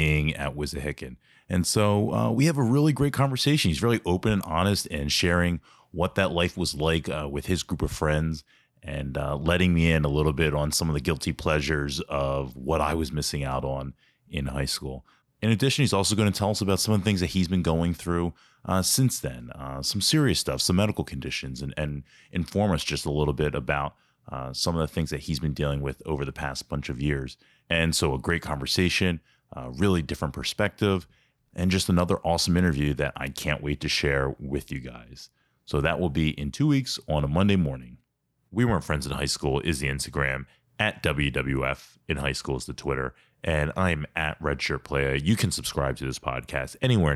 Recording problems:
abrupt cut into speech; at the start and the end

